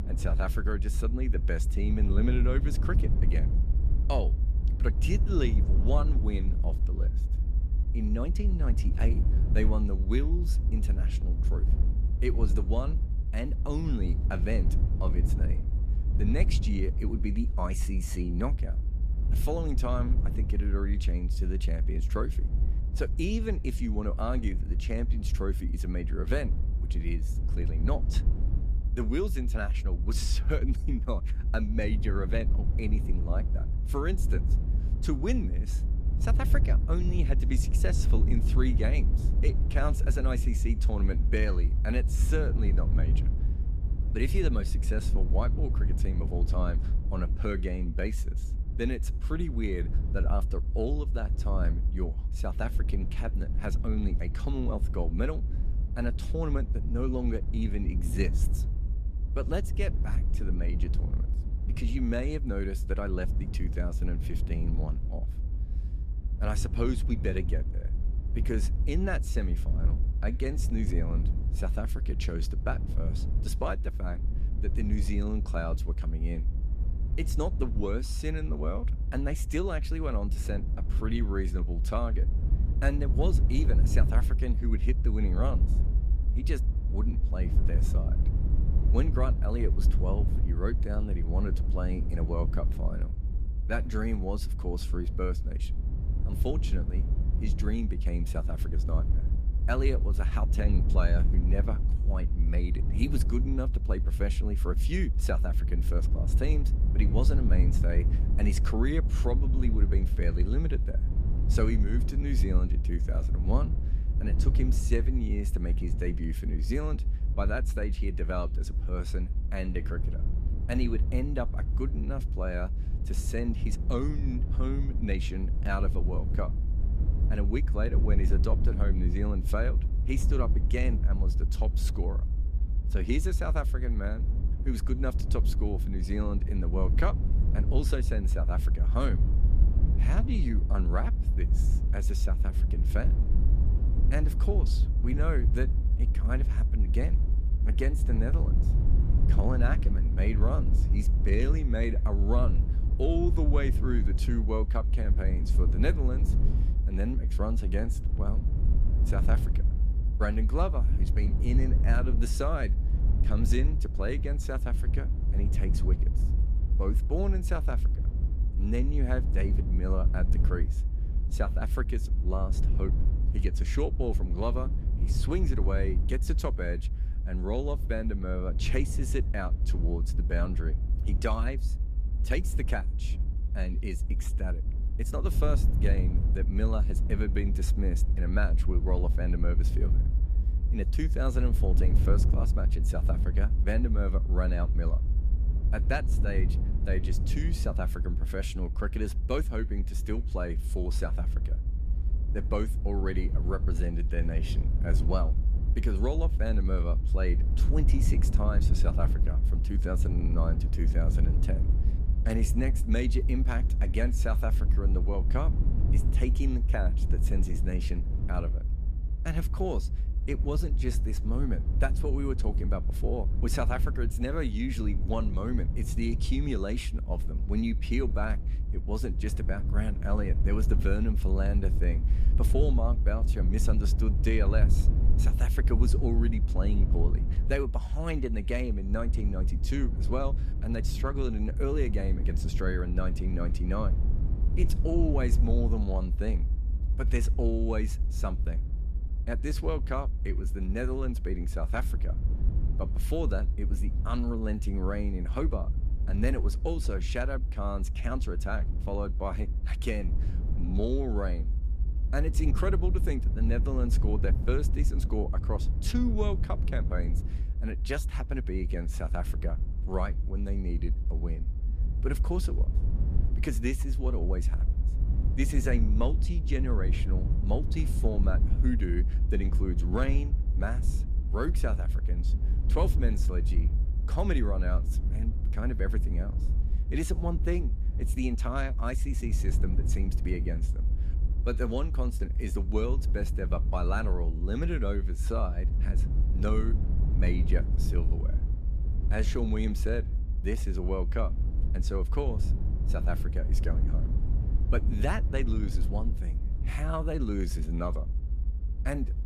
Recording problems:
low rumble; loud; throughout; 9 dB below the speech

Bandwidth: 14.5 kHz